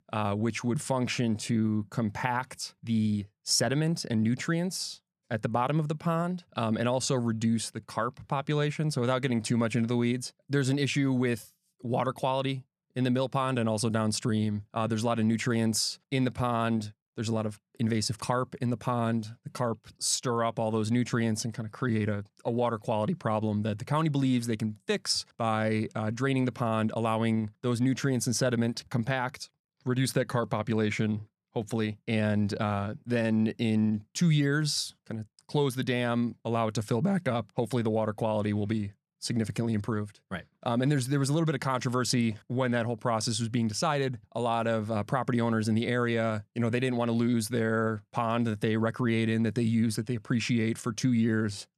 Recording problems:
none

